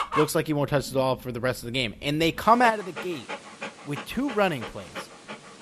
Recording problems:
animal sounds; noticeable; throughout; 15 dB below the speech

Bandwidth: 13.5 kHz